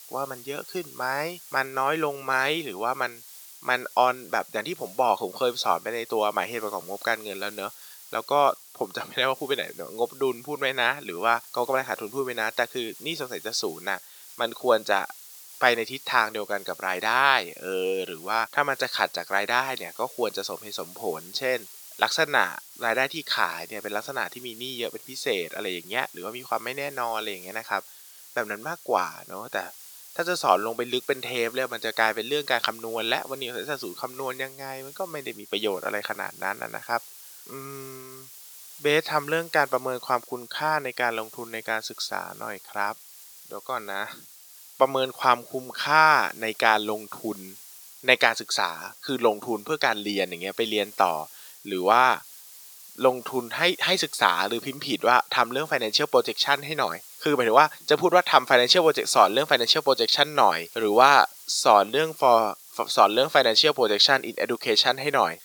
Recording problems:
thin; very; fading below 500 Hz
hiss; noticeable; throughout; 20 dB below the speech

